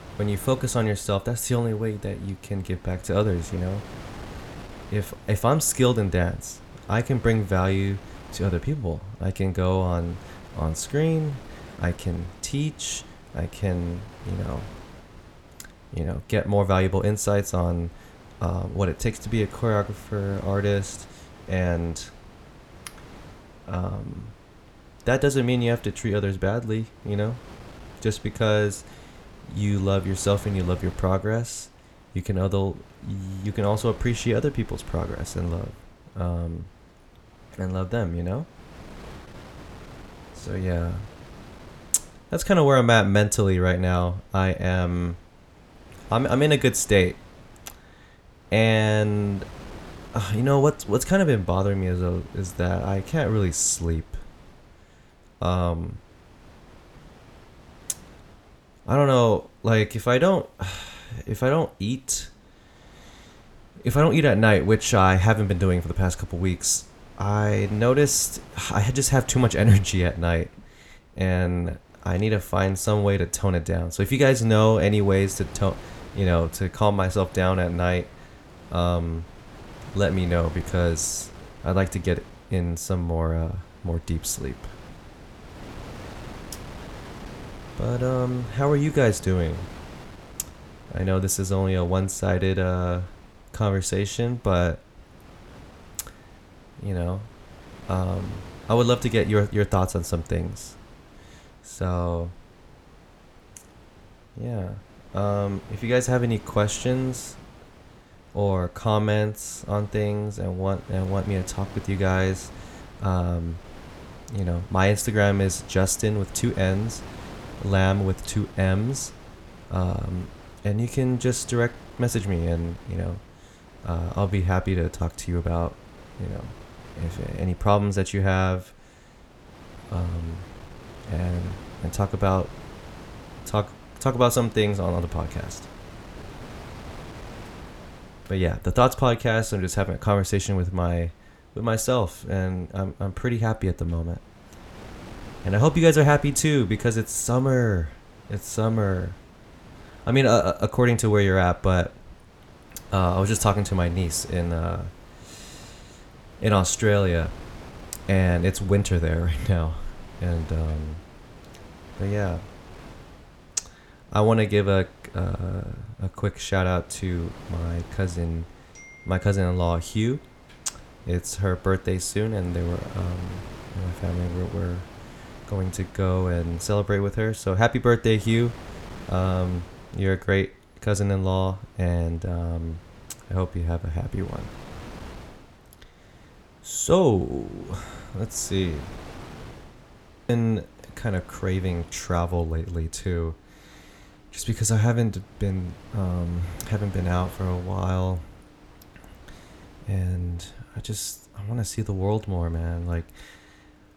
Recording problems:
wind noise on the microphone; occasional gusts; 20 dB below the speech

